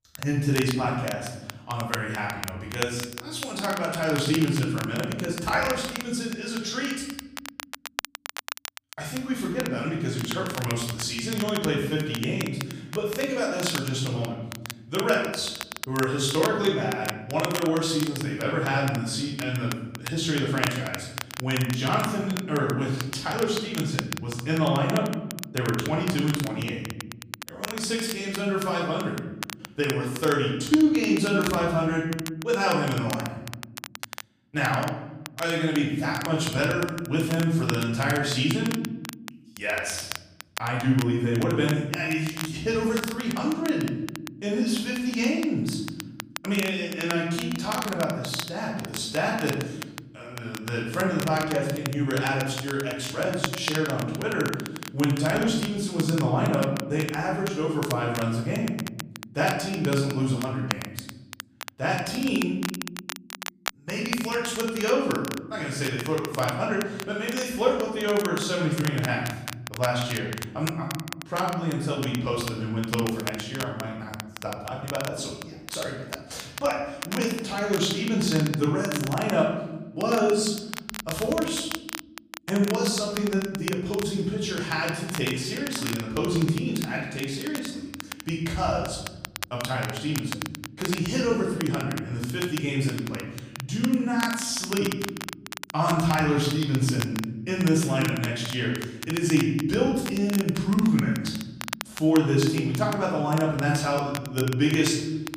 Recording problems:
off-mic speech; far
room echo; noticeable; dies away in 1.1 s
crackle, like an old record; noticeable; 10 dB below the speech

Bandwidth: 15 kHz